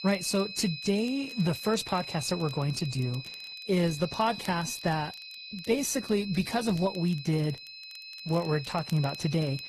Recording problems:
garbled, watery; slightly; nothing above 14 kHz
high-pitched whine; loud; throughout; 4 kHz, 9 dB below the speech
crackle, like an old record; faint; 25 dB below the speech

